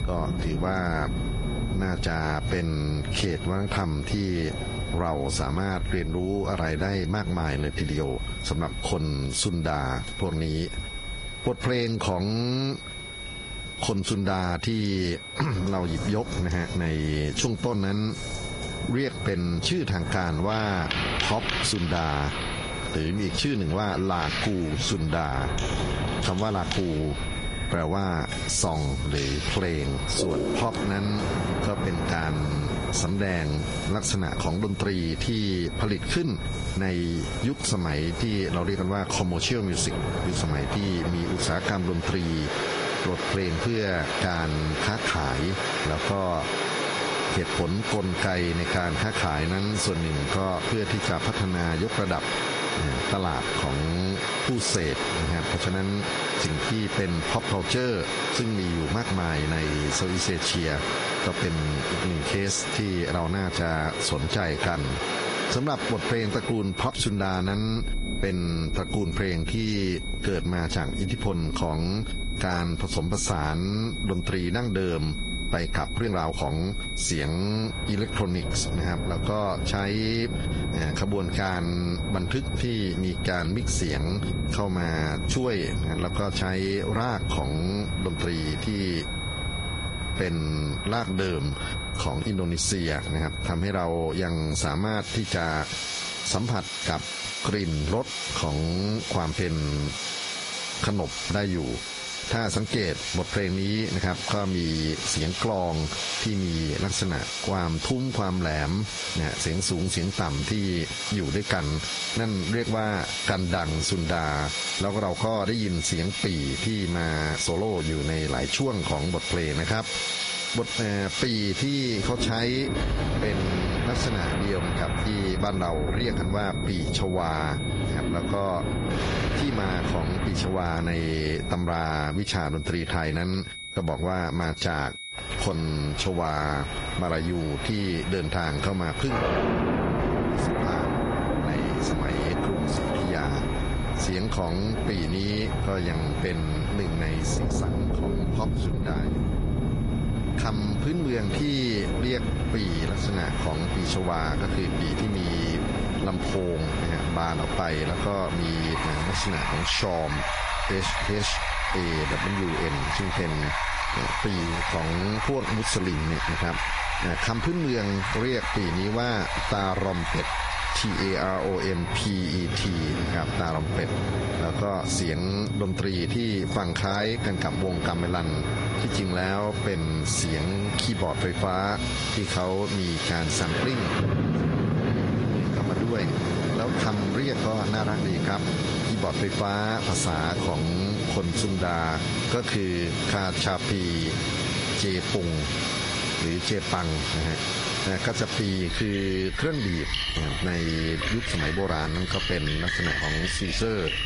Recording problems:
squashed, flat; heavily, background pumping
garbled, watery; slightly; nothing above 10.5 kHz
rain or running water; loud; throughout; 3 dB below the speech
high-pitched whine; noticeable; throughout; 2 kHz, 10 dB below the speech
uneven, jittery; strongly; from 22 s to 2:37

